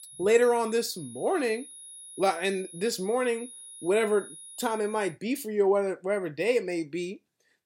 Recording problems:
high-pitched whine; noticeable; until 5 s; 10.5 kHz, 15 dB below the speech

